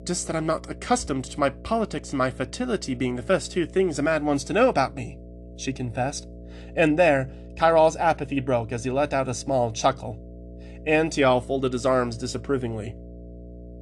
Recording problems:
electrical hum; faint; throughout; 60 Hz, 25 dB below the speech

